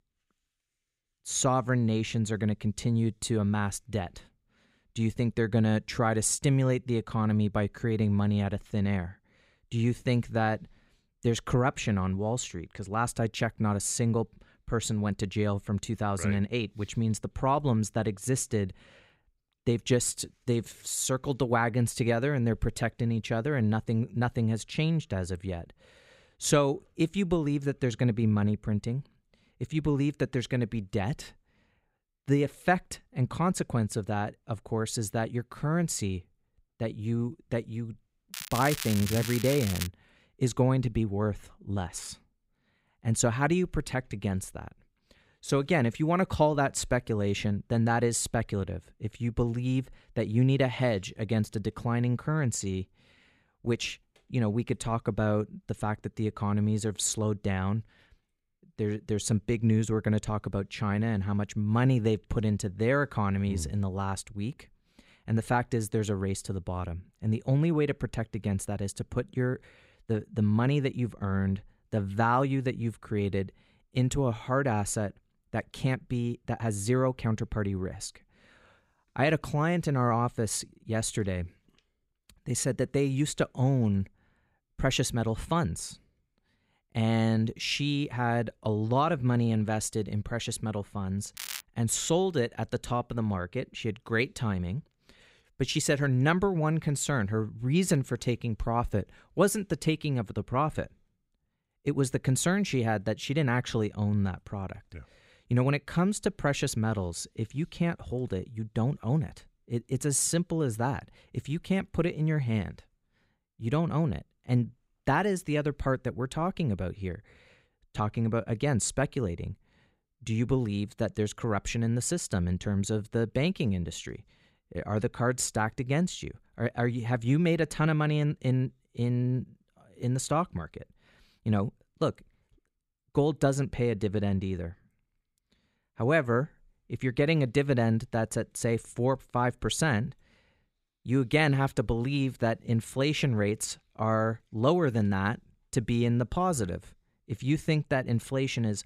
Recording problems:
crackling; loud; from 38 to 40 s and at 1:31; 7 dB below the speech

